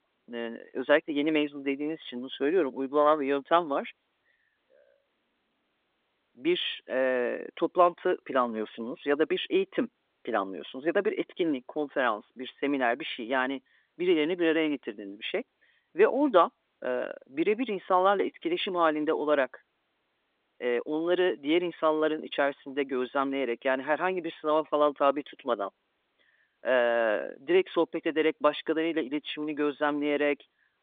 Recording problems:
phone-call audio

